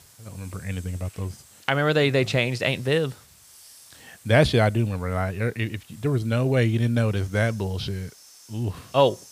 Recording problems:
hiss; faint; throughout; 25 dB below the speech

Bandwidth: 15 kHz